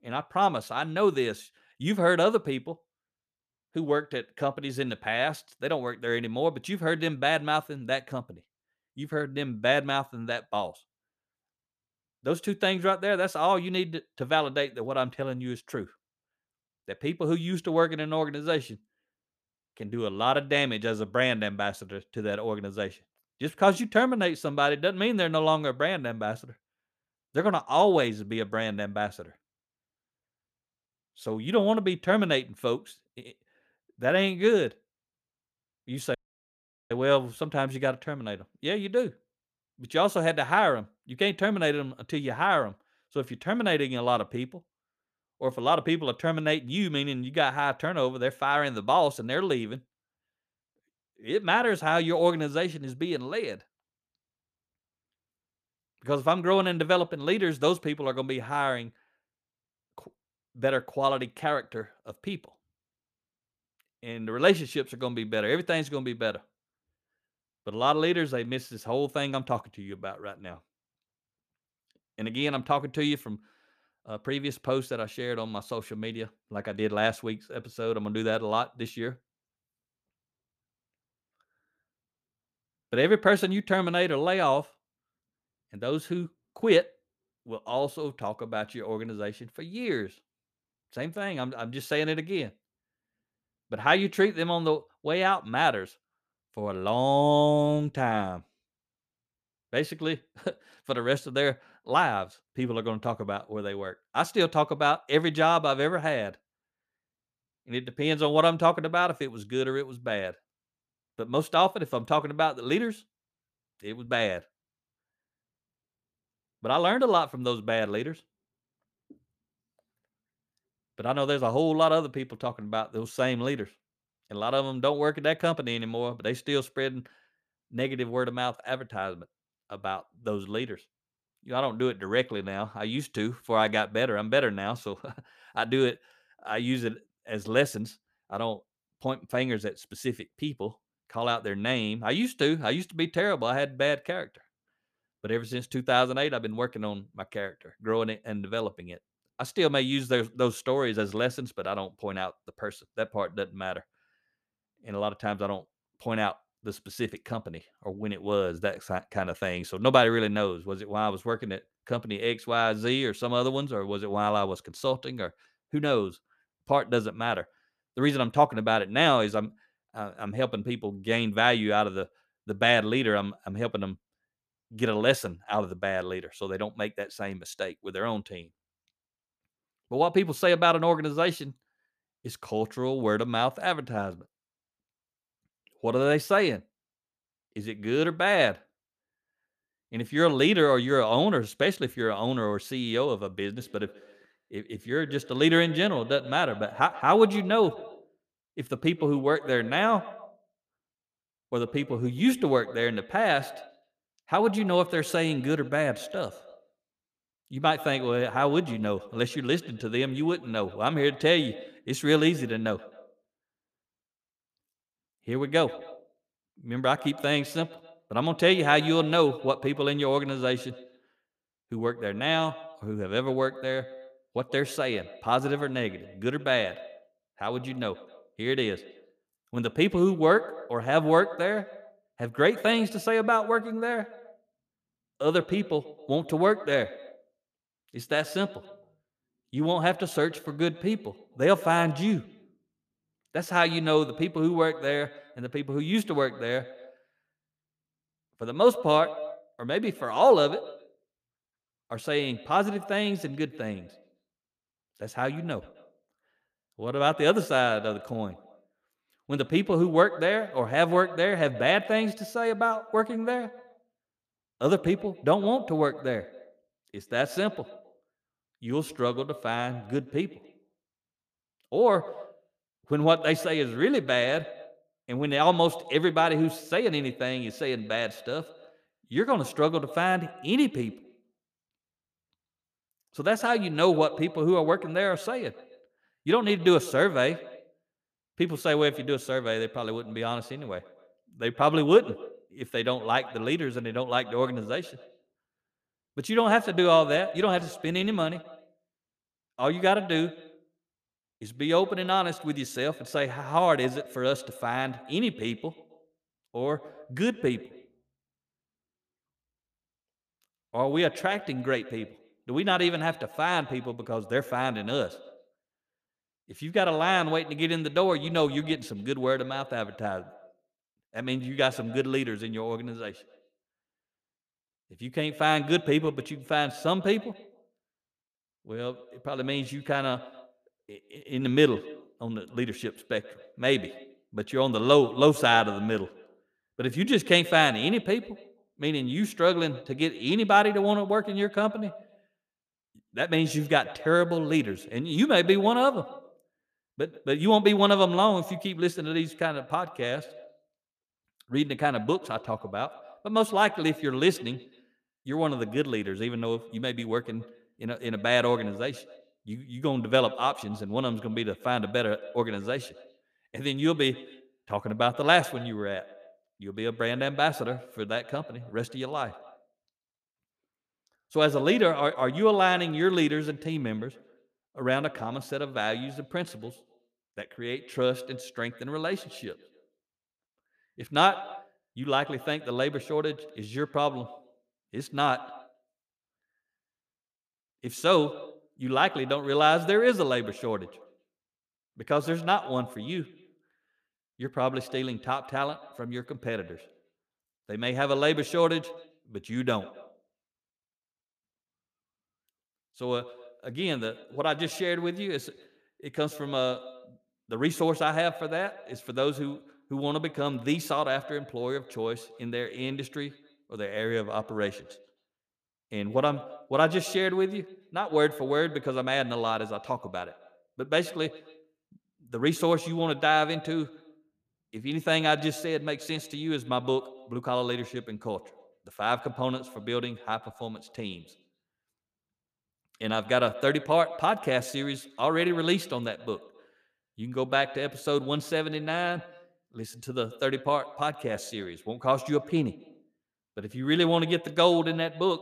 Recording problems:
echo of what is said; noticeable; from 3:14 on; 130 ms later, 15 dB below the speech
audio cutting out; at 36 s for 1 s

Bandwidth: 14.5 kHz